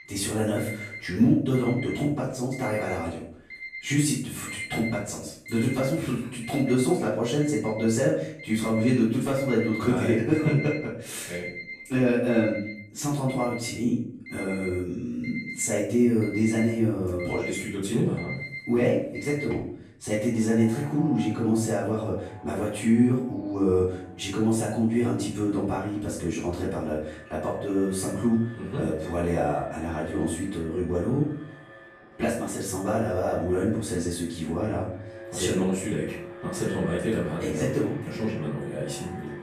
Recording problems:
off-mic speech; far
room echo; noticeable; dies away in 0.5 s
alarms or sirens; noticeable; throughout; 15 dB below the speech

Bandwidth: 14 kHz